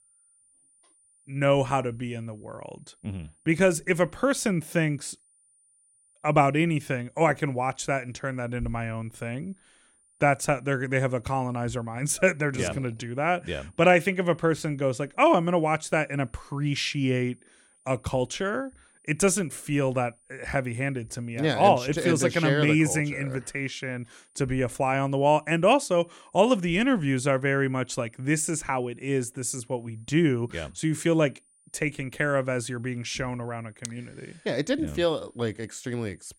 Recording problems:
high-pitched whine; faint; throughout; 9.5 kHz, 35 dB below the speech

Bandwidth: 16.5 kHz